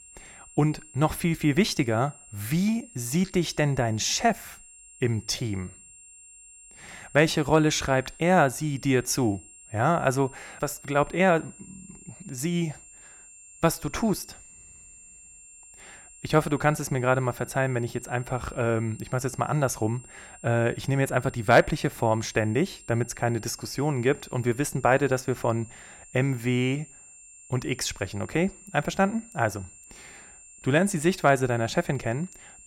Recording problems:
high-pitched whine; faint; throughout; 7.5 kHz, 20 dB below the speech

